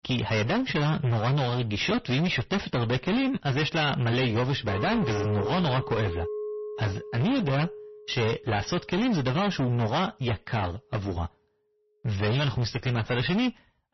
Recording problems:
distortion; heavy; 27% of the sound clipped
garbled, watery; slightly; nothing above 6 kHz
clattering dishes; noticeable; from 4.5 to 9 s; peak 4 dB below the speech

